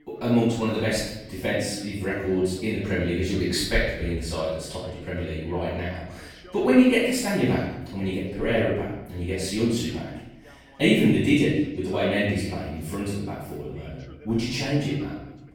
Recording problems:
room echo; strong; dies away in 0.9 s
off-mic speech; far
voice in the background; faint; throughout; 25 dB below the speech

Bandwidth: 17 kHz